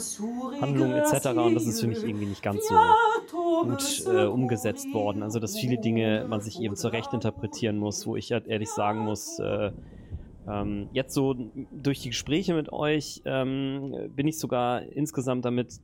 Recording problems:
rain or running water; very loud; throughout; 1 dB above the speech

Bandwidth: 16.5 kHz